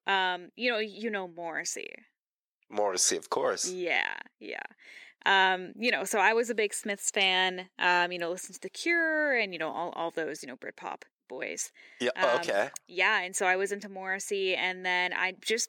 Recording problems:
thin; somewhat; fading below 500 Hz

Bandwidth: 17.5 kHz